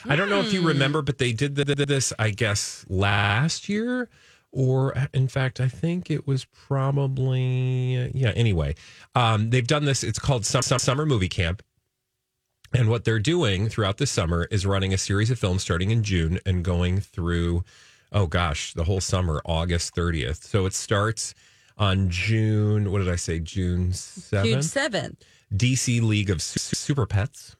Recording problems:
audio stuttering; 4 times, first at 1.5 s

